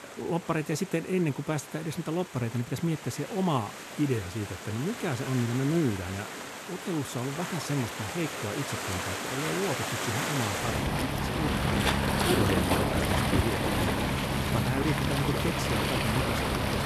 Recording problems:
rain or running water; very loud; throughout; 2 dB above the speech

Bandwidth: 13.5 kHz